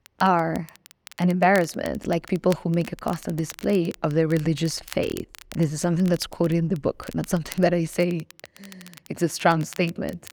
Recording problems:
crackle, like an old record; faint; 20 dB below the speech

